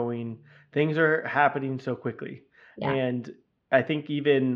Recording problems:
muffled; slightly; fading above 2.5 kHz
abrupt cut into speech; at the start and the end

